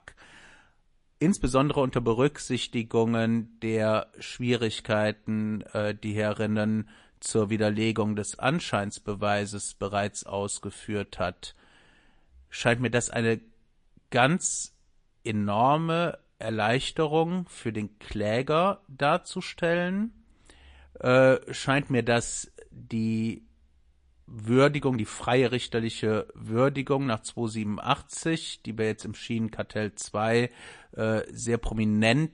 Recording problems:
garbled, watery; slightly; nothing above 9.5 kHz

